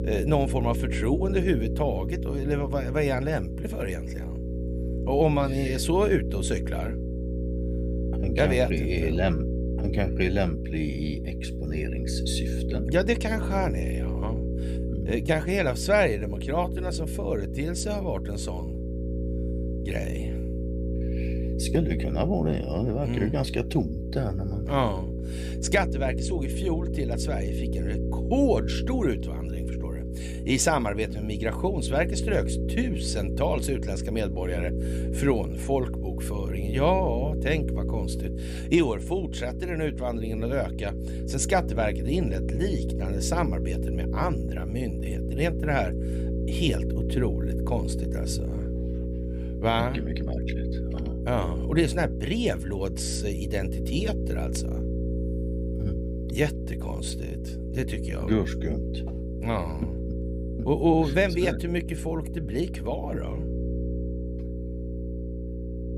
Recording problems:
electrical hum; loud; throughout; 60 Hz, 9 dB below the speech

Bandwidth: 15 kHz